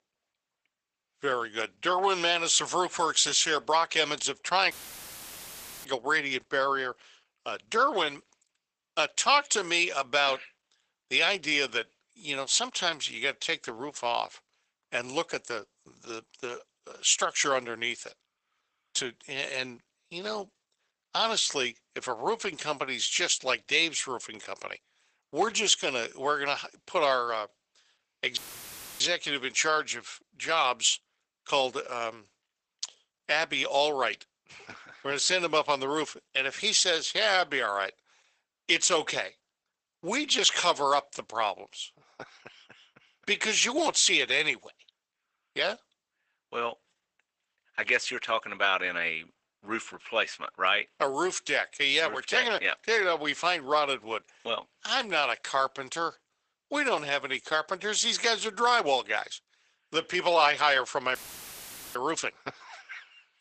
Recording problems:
garbled, watery; badly; nothing above 8 kHz
thin; very; fading below 600 Hz
audio cutting out; filled with static; at 4.5 s for 1 s, at 28 s for 0.5 s and at 1:01 for 1 s

